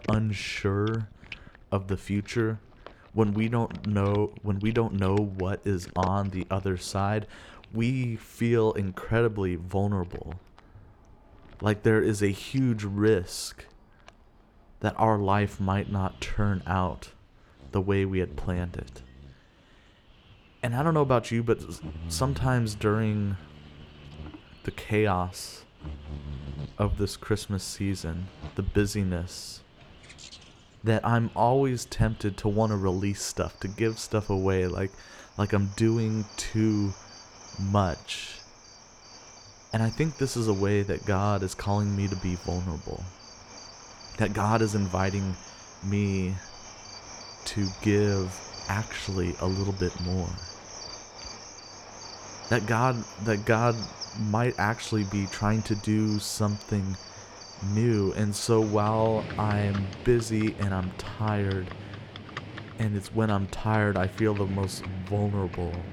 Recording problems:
animal sounds; noticeable; throughout; 15 dB below the speech

